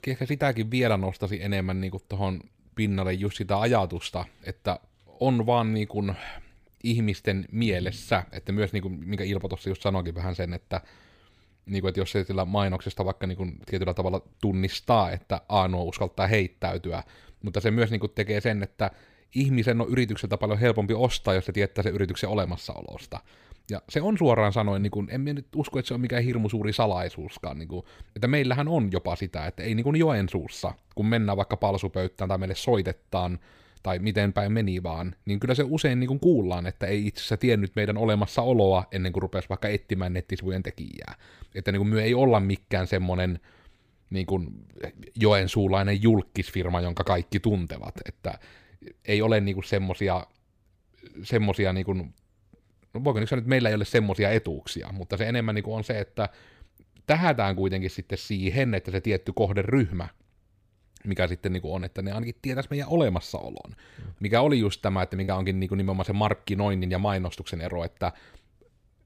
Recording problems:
choppy; occasionally; at 28 s and at 1:05; 2% of the speech affected

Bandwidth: 15 kHz